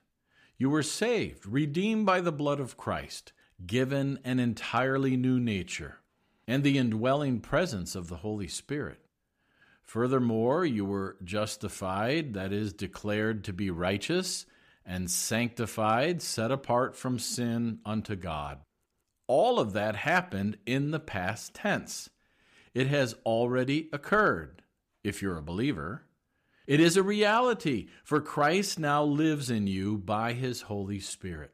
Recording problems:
none

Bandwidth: 15 kHz